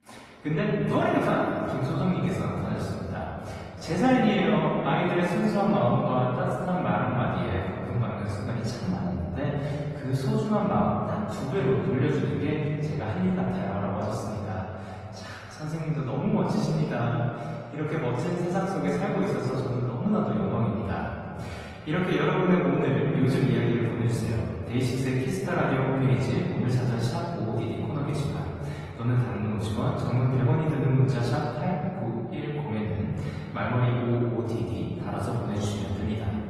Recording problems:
off-mic speech; far
room echo; noticeable; dies away in 2.3 s
garbled, watery; slightly; nothing above 15.5 kHz

